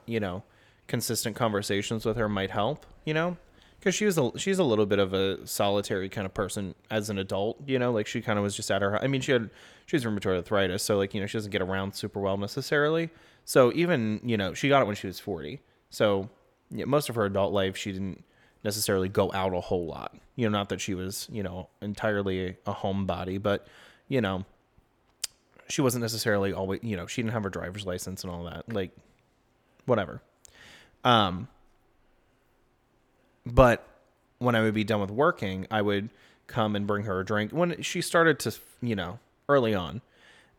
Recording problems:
none

